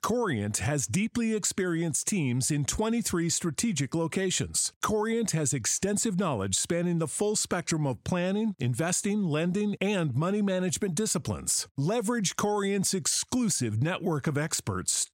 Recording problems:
squashed, flat; somewhat

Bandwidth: 16 kHz